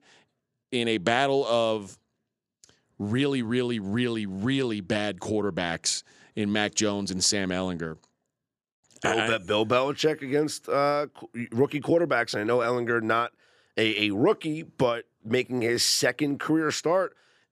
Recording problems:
none

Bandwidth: 14.5 kHz